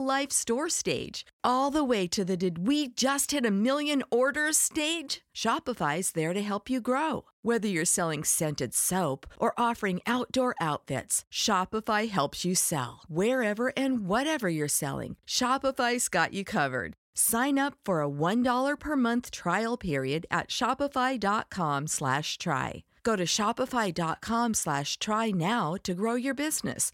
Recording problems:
abrupt cut into speech; at the start

